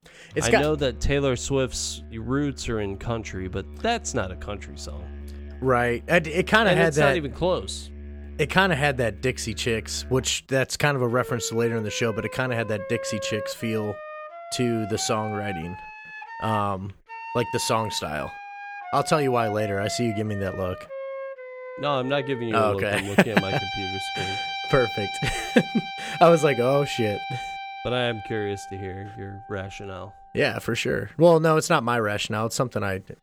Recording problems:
background music; noticeable; throughout; 10 dB below the speech

